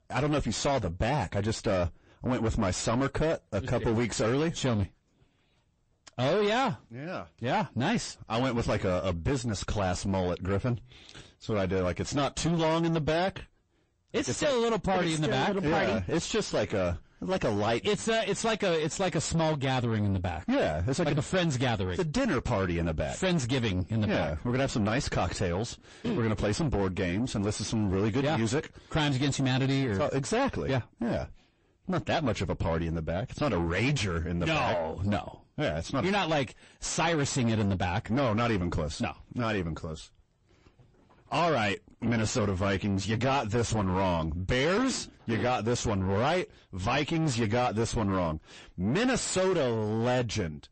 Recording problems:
distortion; heavy; 6 dB below the speech
garbled, watery; slightly; nothing above 8 kHz

